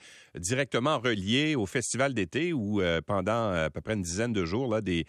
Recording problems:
none

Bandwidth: 13.5 kHz